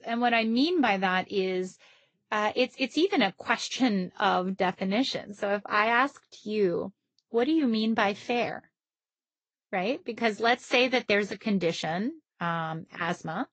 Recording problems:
high frequencies cut off; noticeable; nothing above 7.5 kHz
garbled, watery; slightly

